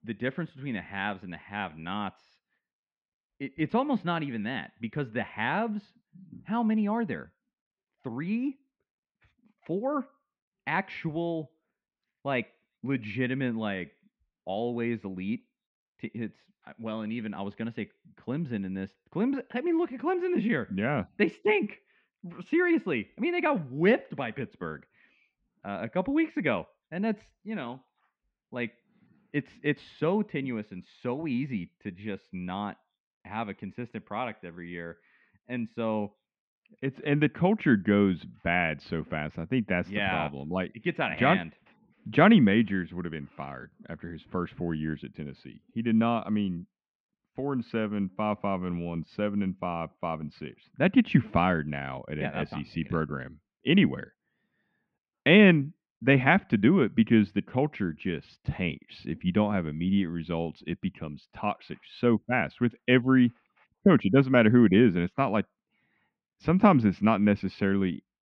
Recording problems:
muffled; very; fading above 2.5 kHz

